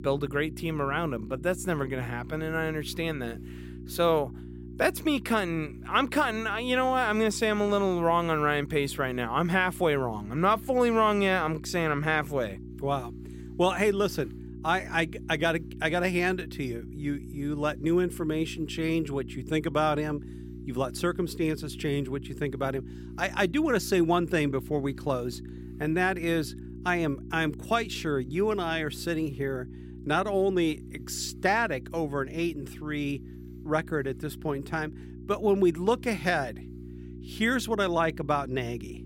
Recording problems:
electrical hum; faint; throughout; 60 Hz, 20 dB below the speech

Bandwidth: 16 kHz